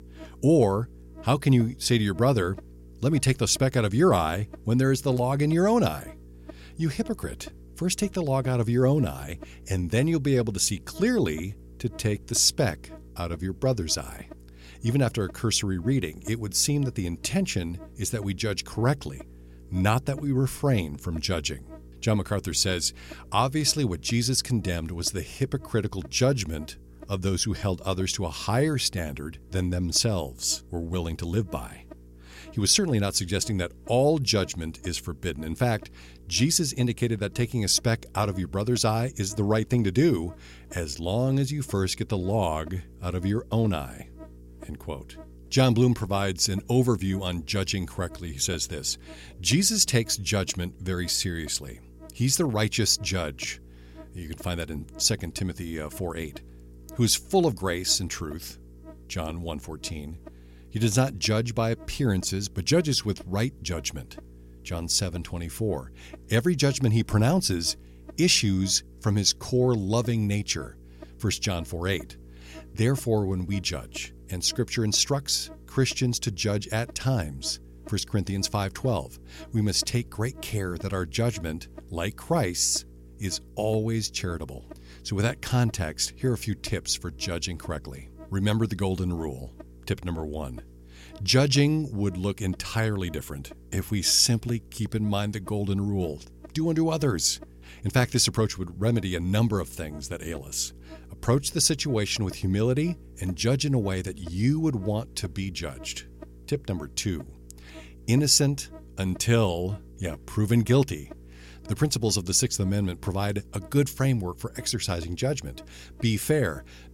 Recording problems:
electrical hum; faint; throughout; 60 Hz, 25 dB below the speech

